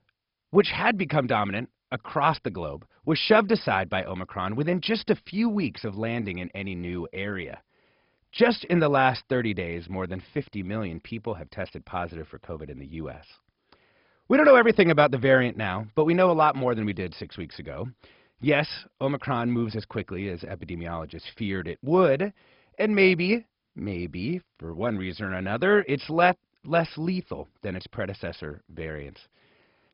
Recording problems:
garbled, watery; badly; nothing above 5 kHz

